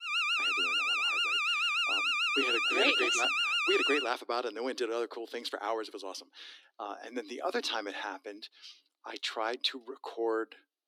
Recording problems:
thin; somewhat; fading below 300 Hz
alarm; loud; until 4 s; peak 7 dB above the speech

